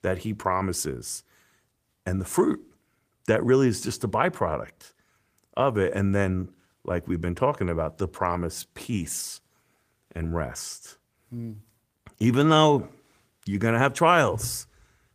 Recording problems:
garbled, watery; slightly; nothing above 15 kHz

